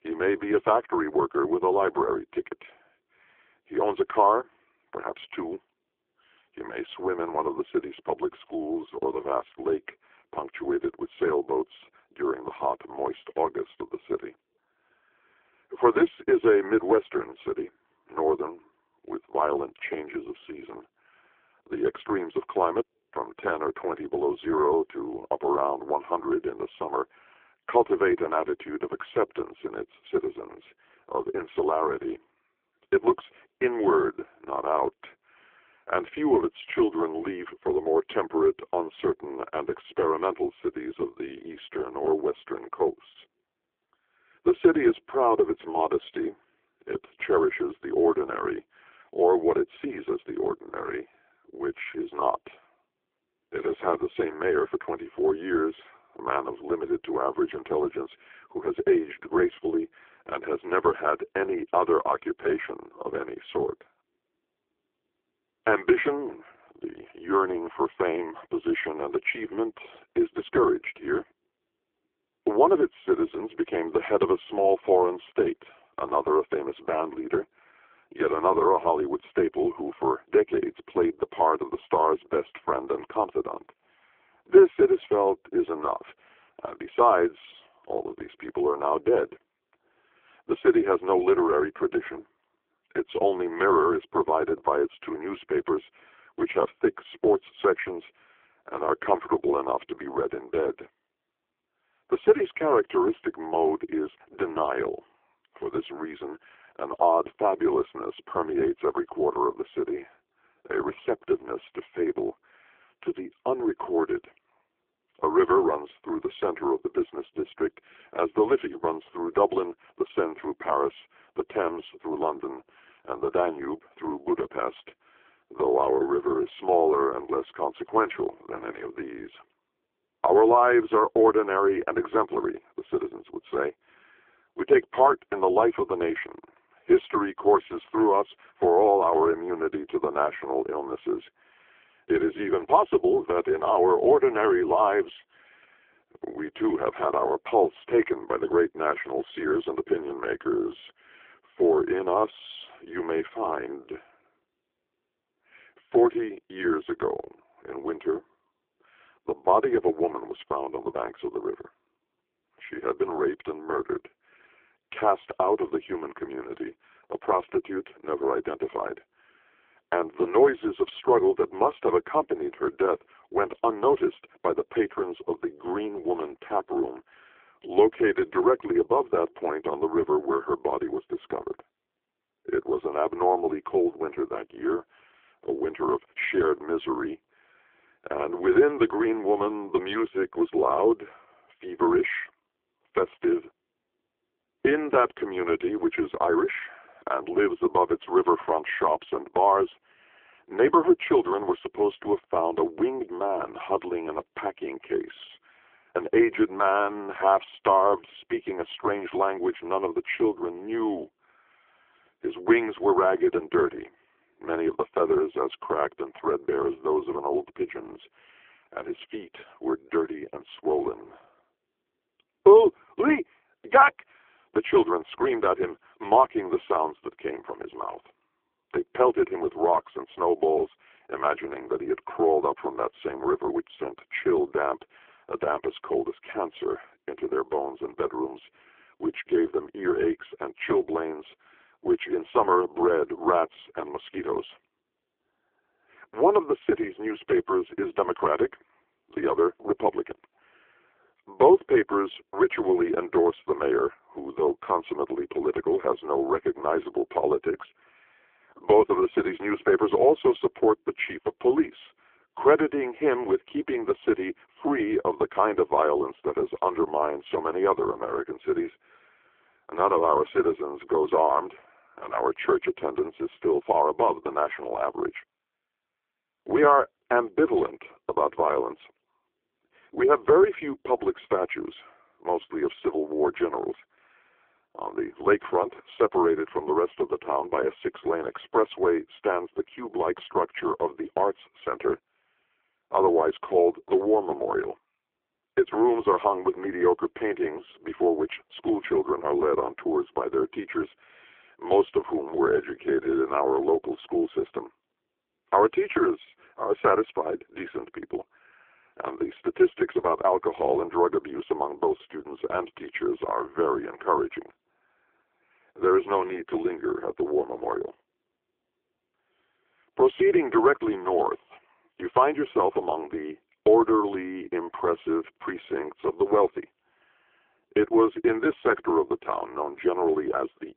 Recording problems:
phone-call audio; poor line

